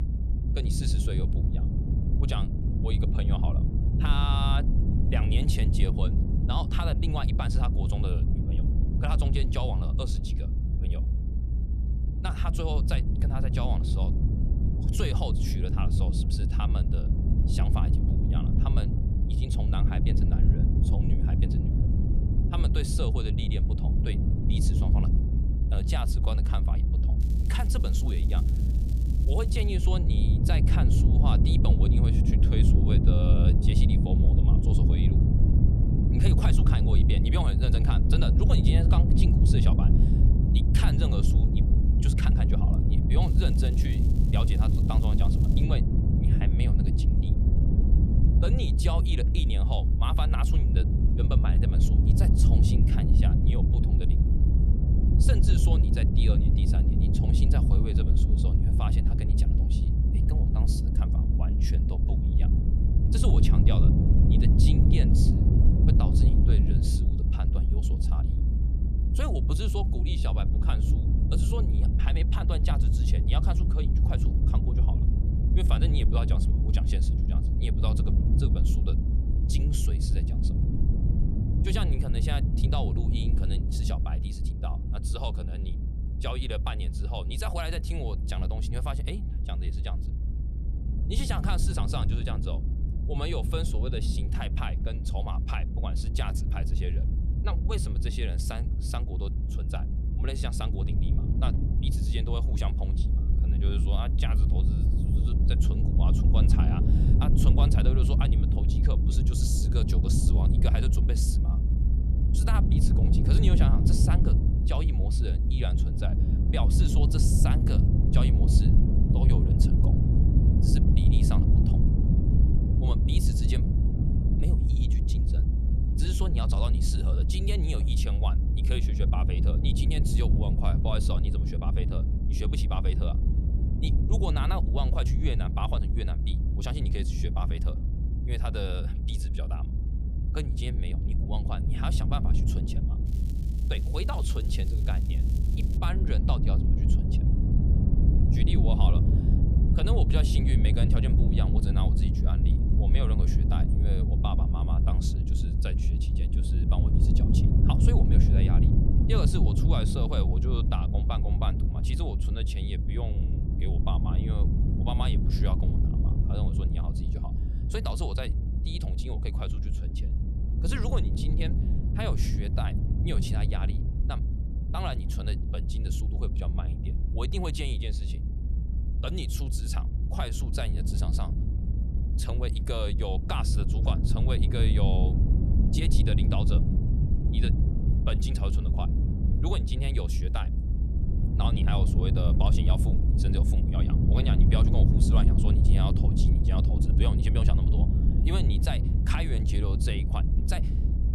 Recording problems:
low rumble; loud; throughout; 1 dB below the speech
crackling; noticeable; from 27 to 30 s, from 43 to 46 s and from 2:23 to 2:26; 15 dB below the speech

